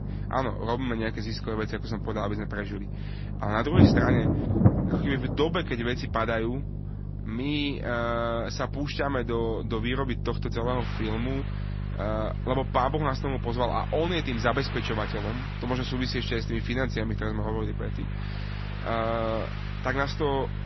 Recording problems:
garbled, watery; slightly; nothing above 6 kHz
rain or running water; loud; throughout; as loud as the speech
electrical hum; noticeable; throughout; 50 Hz, 15 dB below the speech

